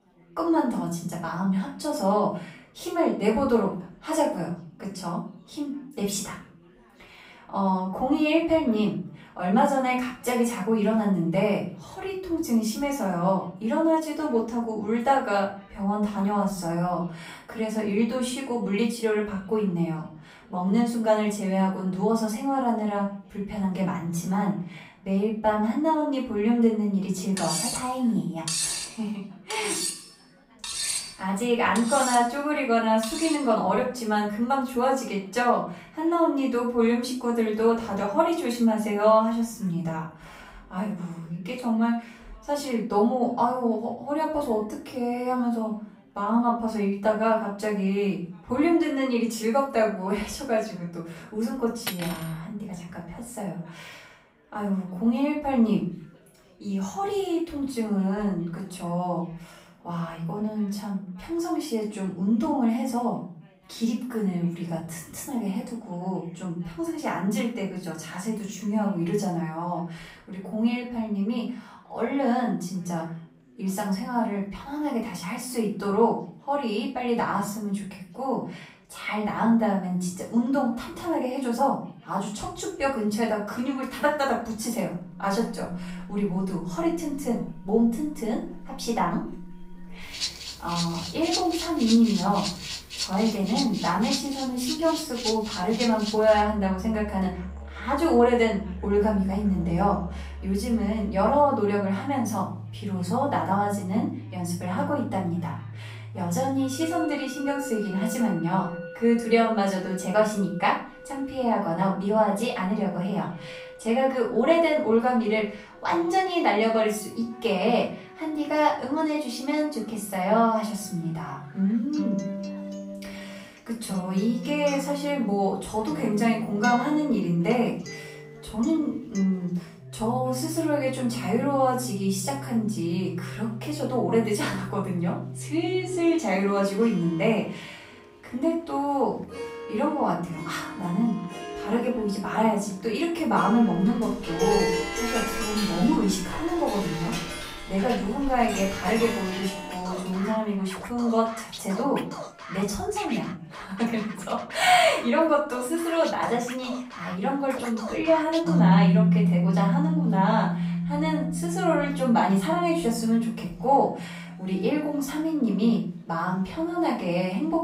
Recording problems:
off-mic speech; far
room echo; noticeable; dies away in 0.4 s
background music; loud; from 1:25 on; 7 dB below the speech
chatter from many people; faint; throughout; 30 dB below the speech
clattering dishes; loud; from 27 to 33 s; peak 1 dB above the speech
clattering dishes; noticeable; at 52 s and from 2:24 to 2:30; peak 7 dB below the speech

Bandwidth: 15.5 kHz